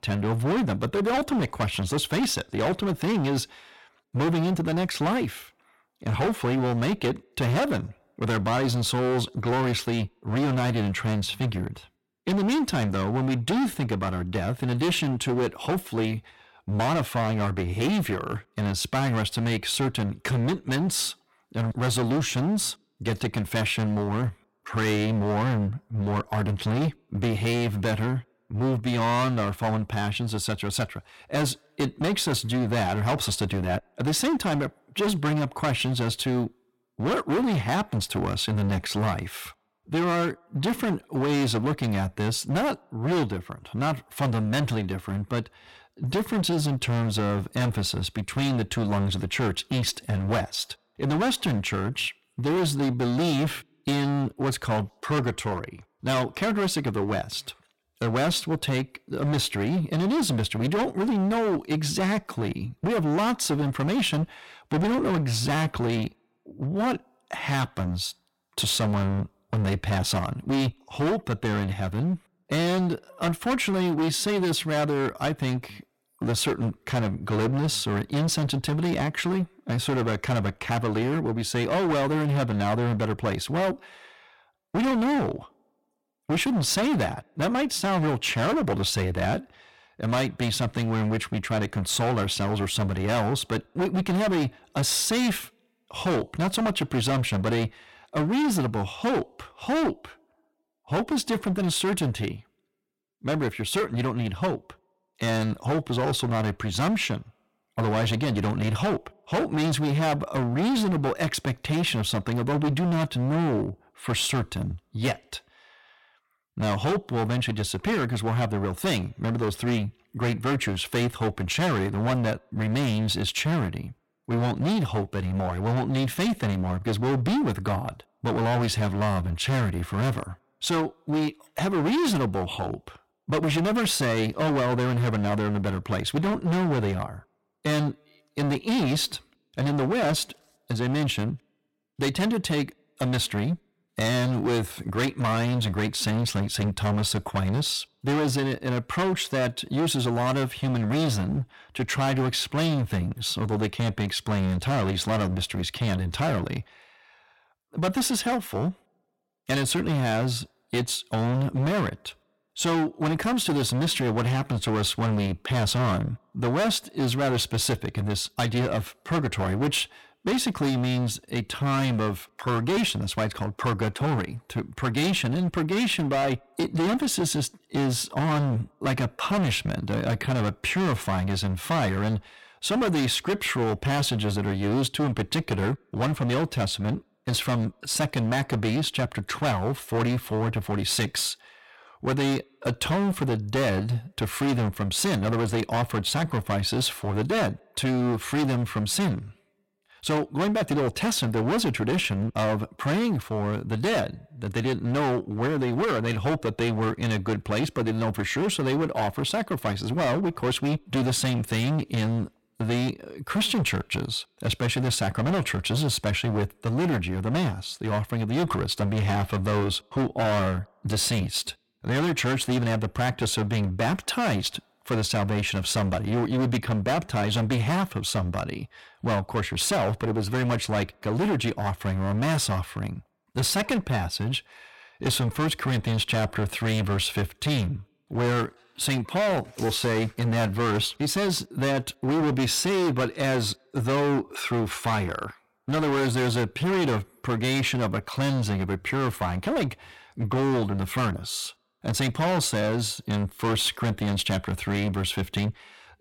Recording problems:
distortion; heavy; 21% of the sound clipped

